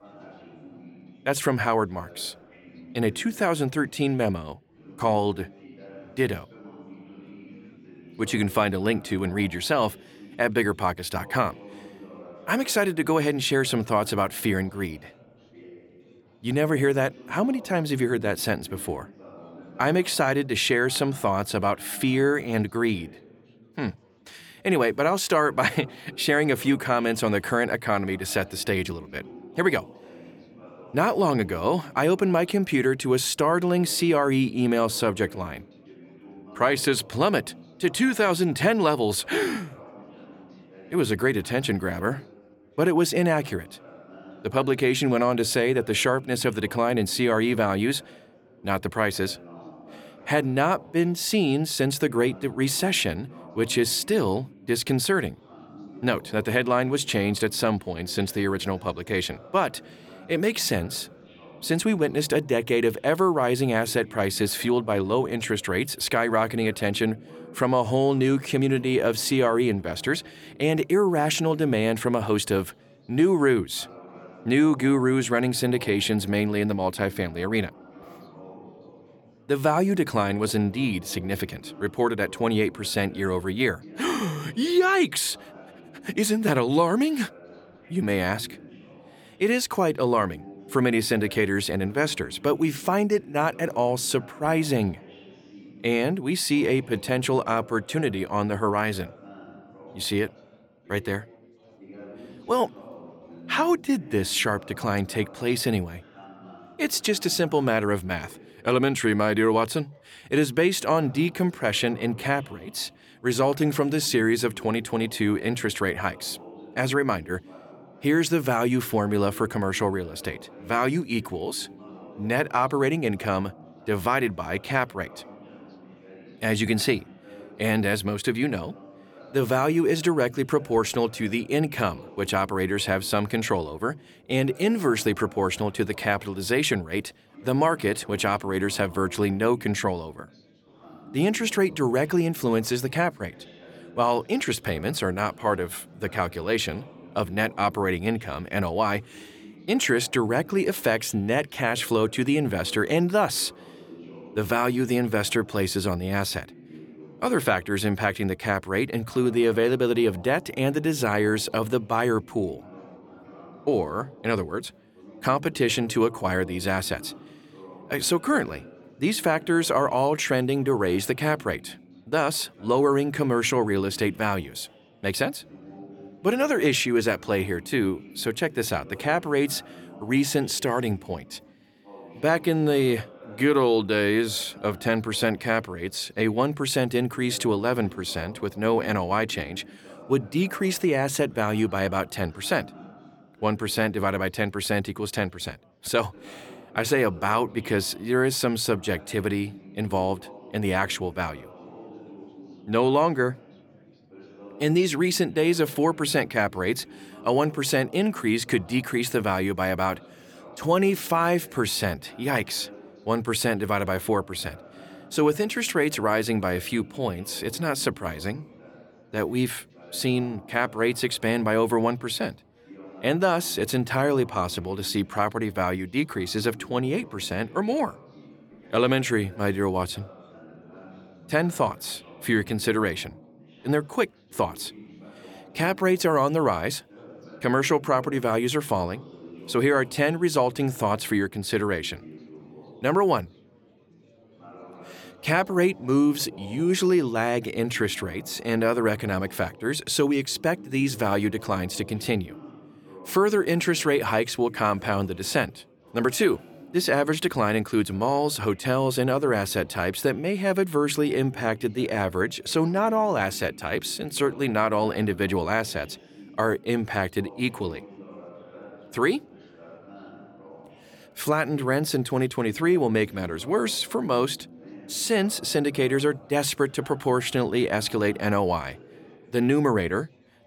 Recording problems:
chatter from many people; faint; throughout; 20 dB below the speech

